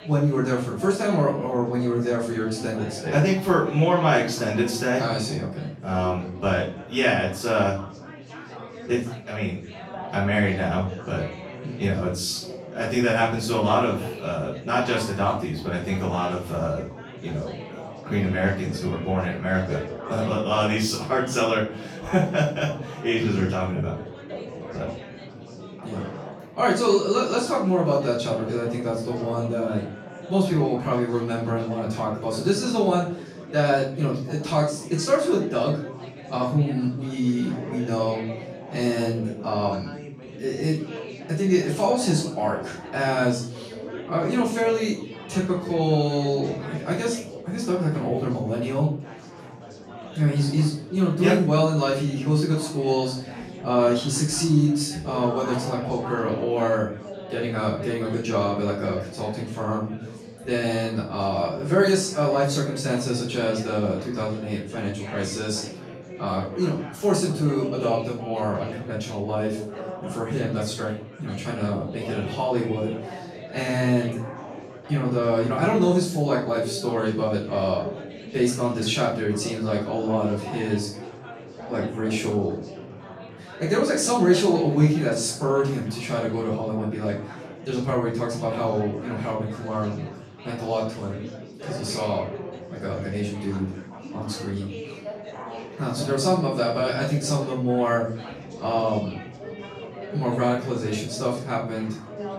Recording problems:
off-mic speech; far
room echo; noticeable; dies away in 0.4 s
chatter from many people; noticeable; throughout; 15 dB below the speech

